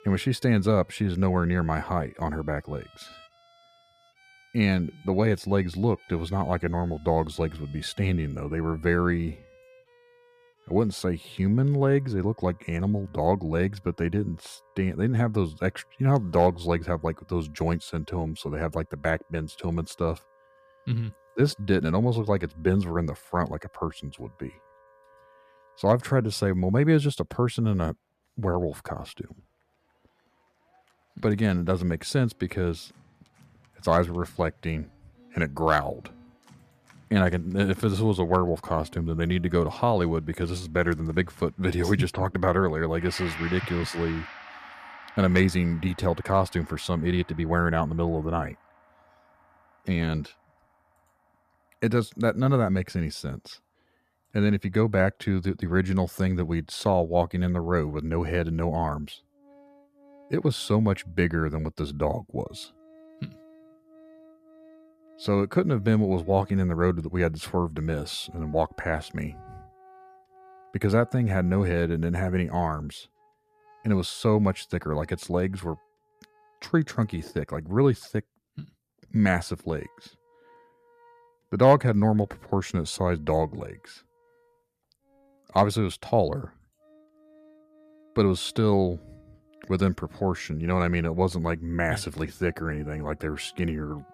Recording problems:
background music; faint; throughout; 25 dB below the speech

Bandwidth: 14.5 kHz